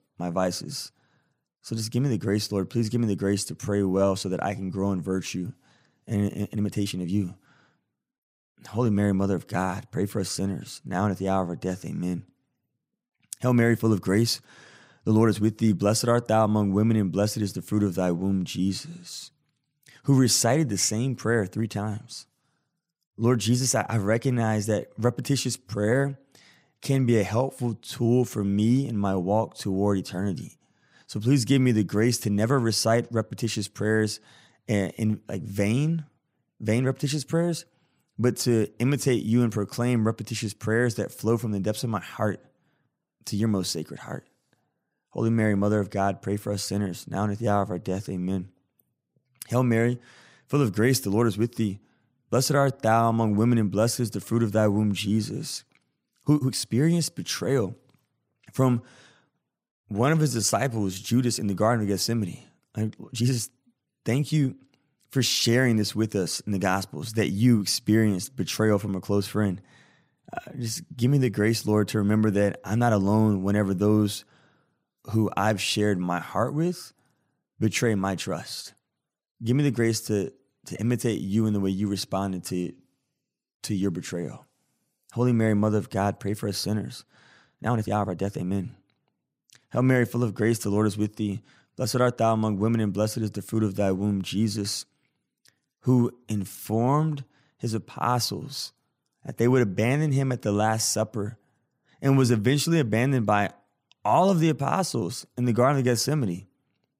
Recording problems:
uneven, jittery; strongly; from 3.5 s to 1:37

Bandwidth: 15.5 kHz